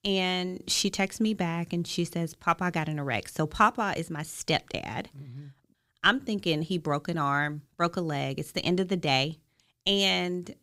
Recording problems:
none

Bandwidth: 15.5 kHz